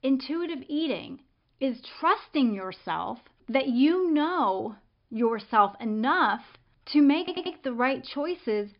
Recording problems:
high frequencies cut off; noticeable; nothing above 5.5 kHz
audio stuttering; at 7 s

